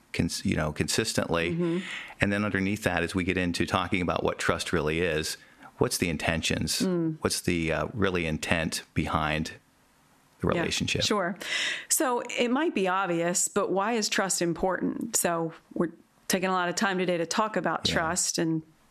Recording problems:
squashed, flat; somewhat

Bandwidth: 13.5 kHz